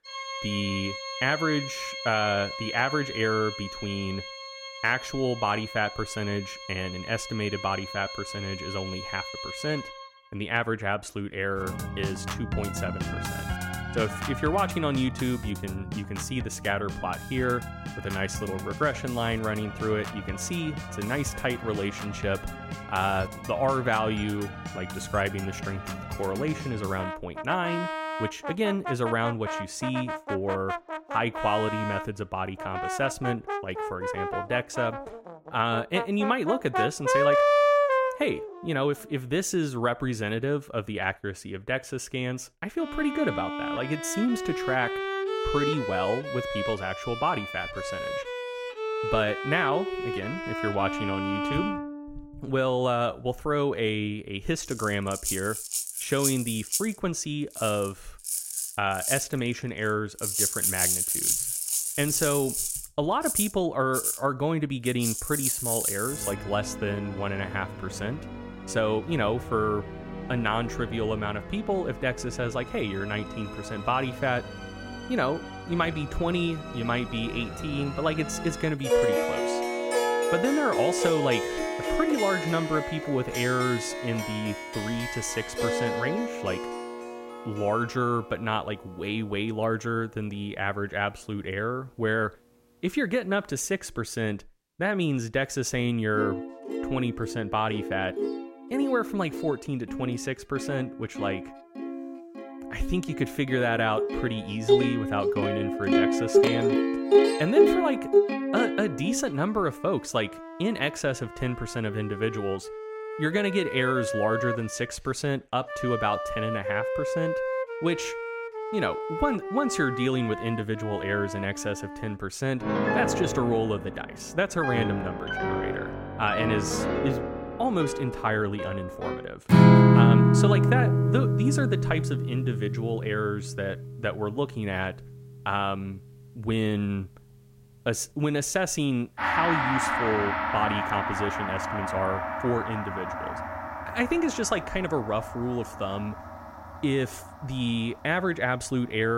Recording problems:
background music; loud; throughout; as loud as the speech
abrupt cut into speech; at the end

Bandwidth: 16 kHz